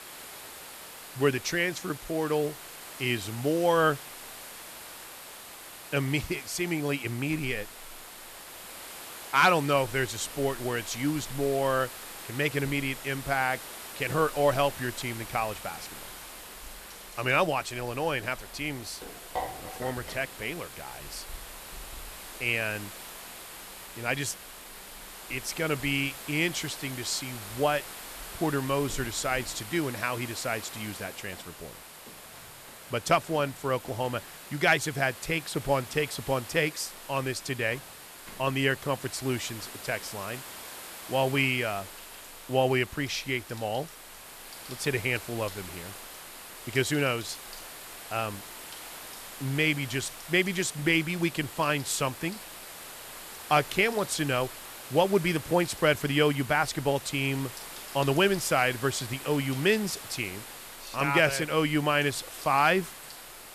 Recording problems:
hiss; noticeable; throughout; 15 dB below the speech
household noises; faint; throughout; 25 dB below the speech

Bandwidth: 14 kHz